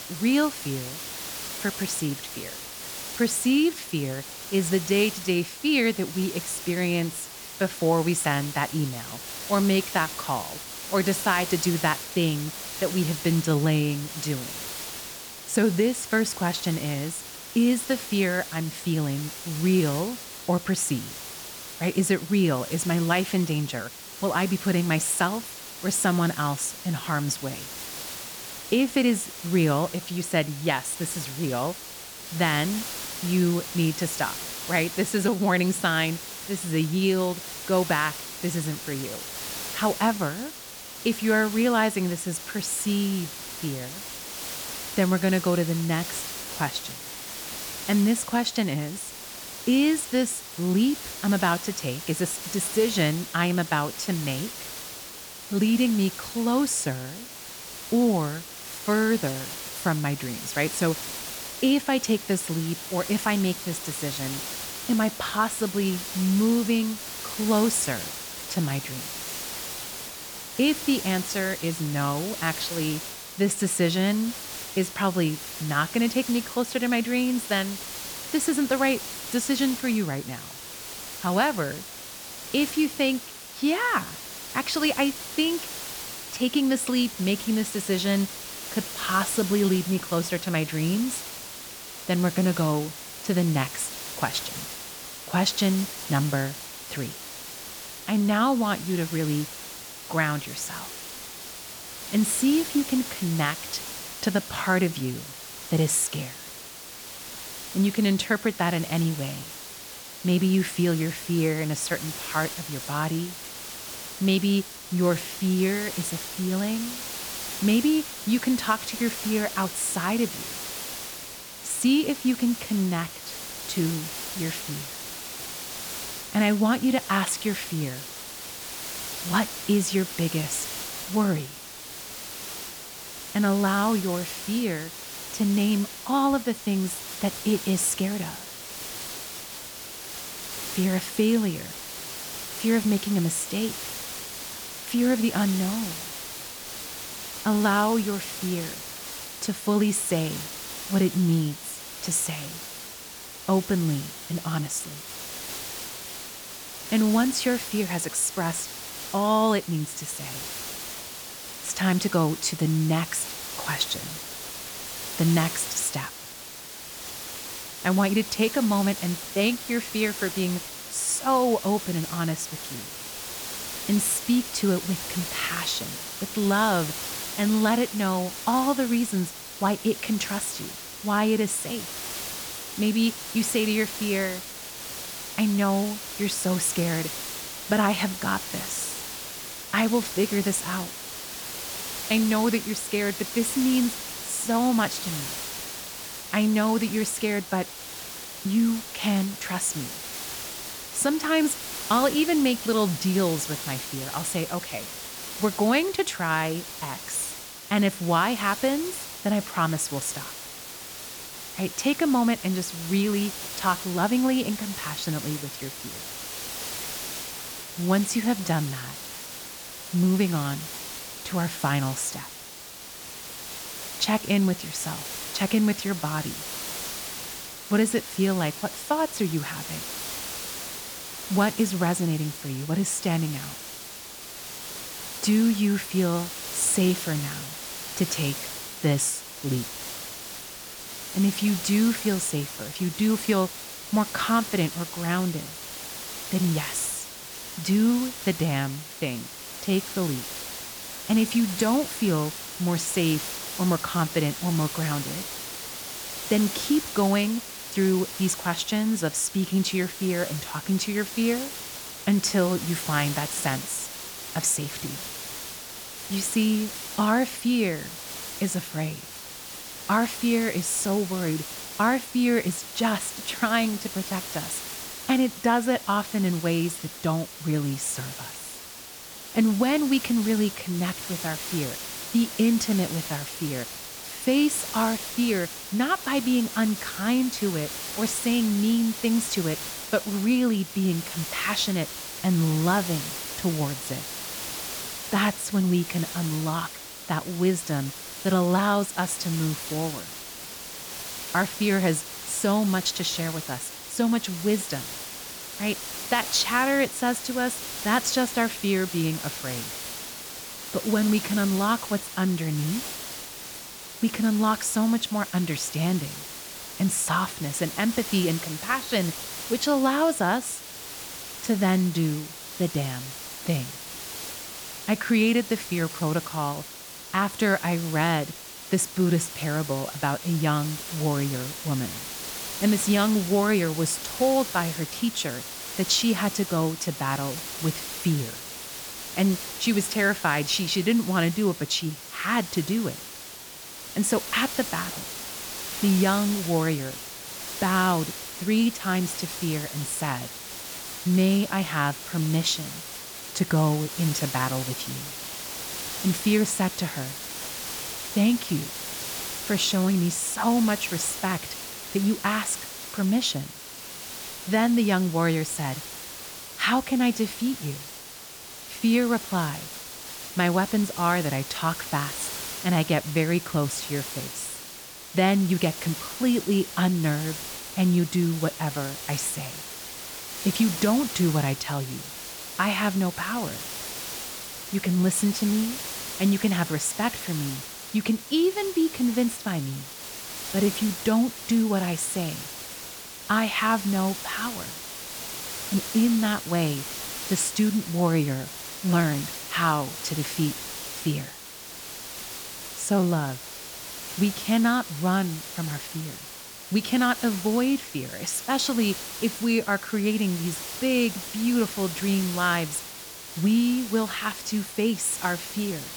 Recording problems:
hiss; loud; throughout; 9 dB below the speech

